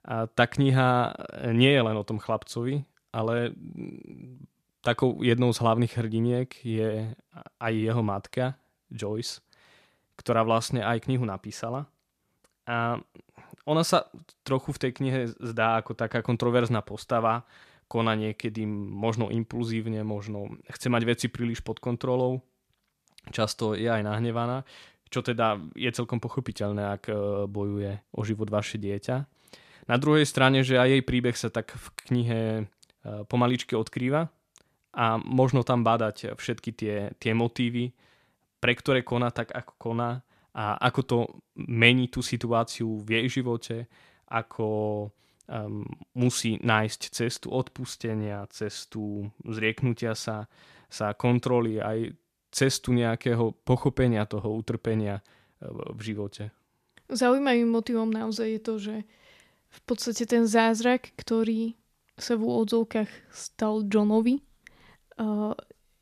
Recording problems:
none

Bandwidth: 14.5 kHz